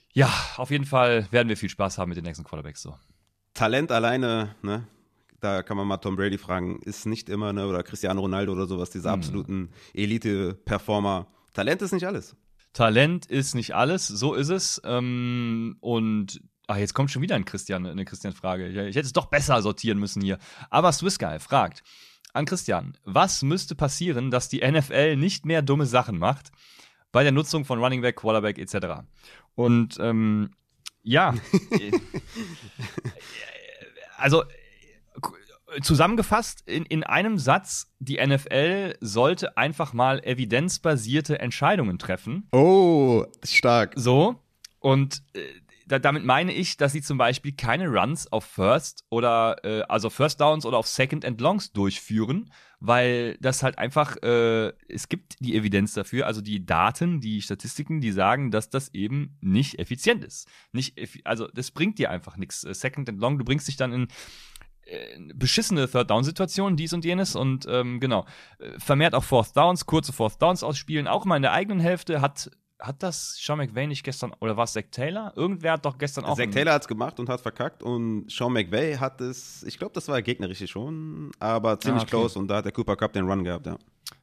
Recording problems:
none

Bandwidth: 14.5 kHz